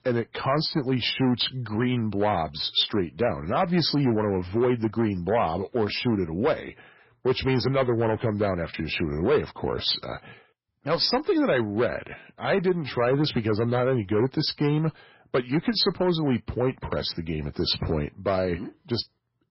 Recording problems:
garbled, watery; badly; nothing above 5.5 kHz
distortion; slight; 5% of the sound clipped

